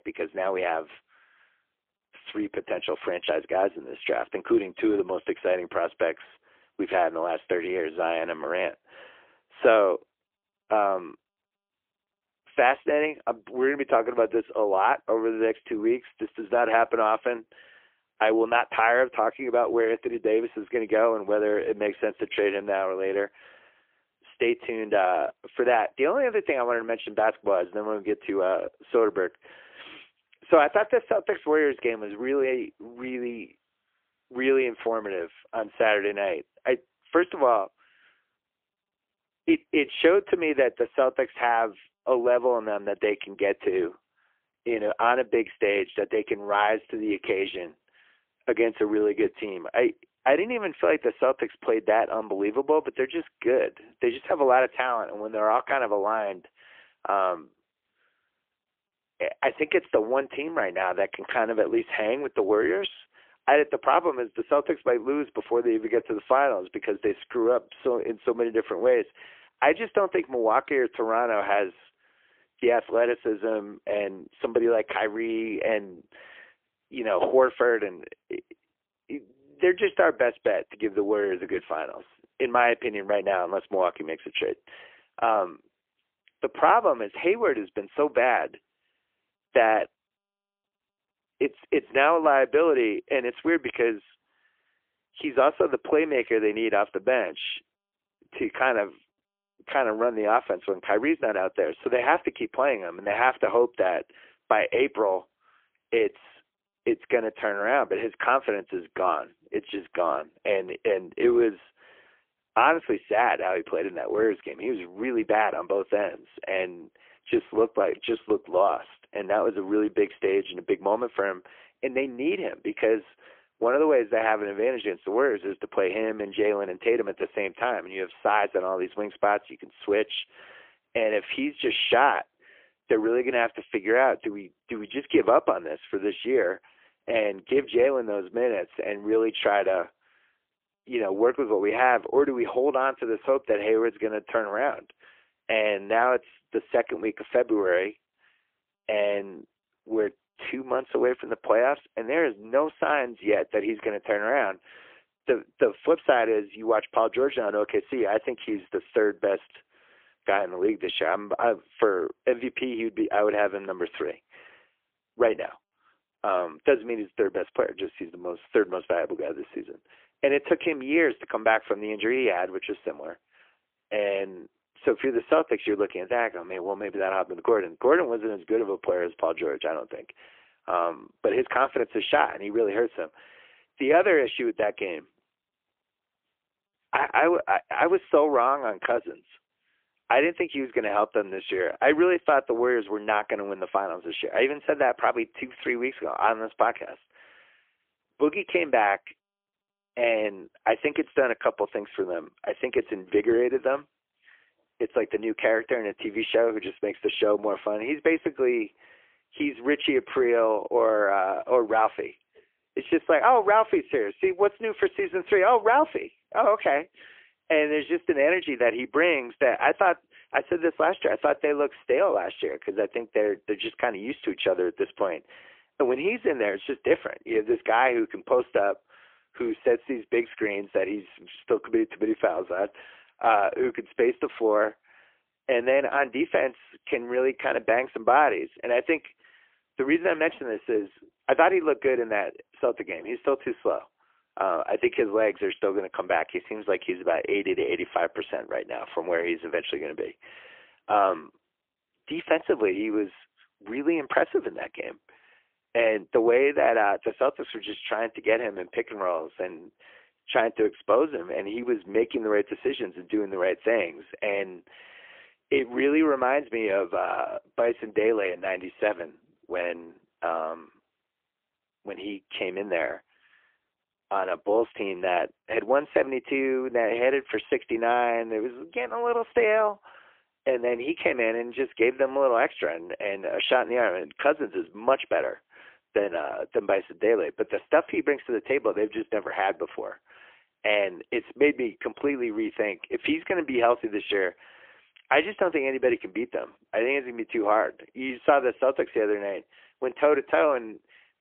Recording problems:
phone-call audio; poor line; nothing above 3.5 kHz

